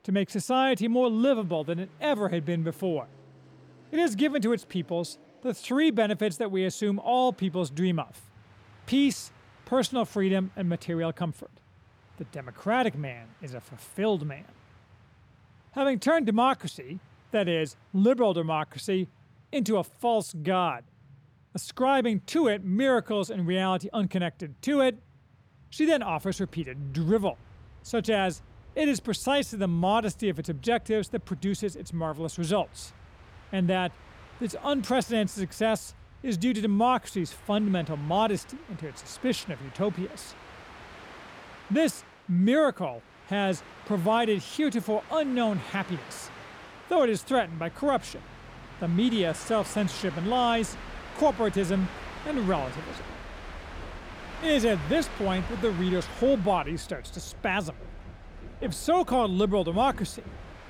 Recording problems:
train or aircraft noise; noticeable; throughout; 20 dB below the speech

